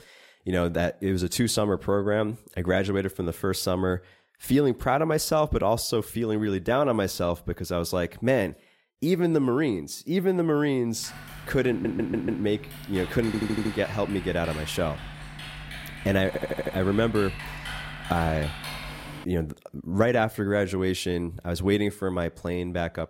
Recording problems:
keyboard typing; noticeable; from 11 to 19 s; peak 8 dB below the speech
audio stuttering; at 12 s, at 13 s and at 16 s

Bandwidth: 16 kHz